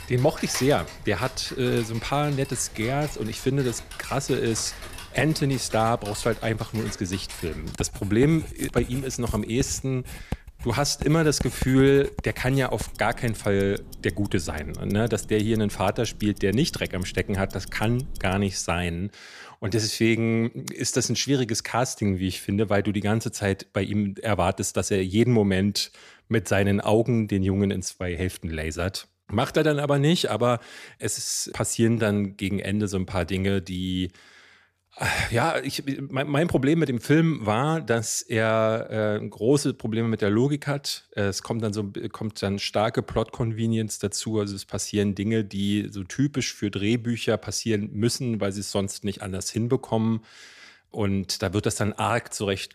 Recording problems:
household noises; noticeable; until 18 s; 15 dB below the speech

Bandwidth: 14.5 kHz